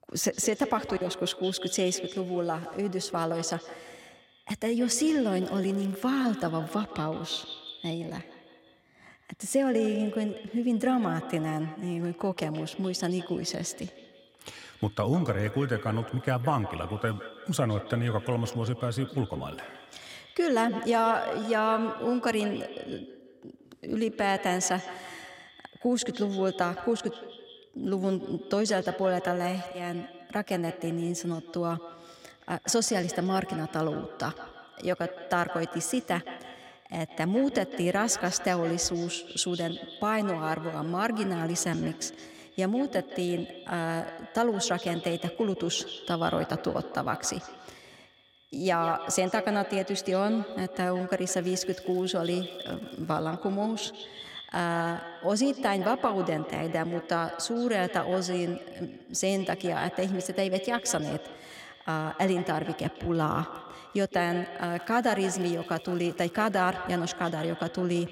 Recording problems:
echo of what is said; strong; throughout; 160 ms later, 10 dB below the speech
crackling; faint; from 5.5 to 6.5 s, from 51 to 53 s and from 1:05 to 1:07; 30 dB below the speech

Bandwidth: 16 kHz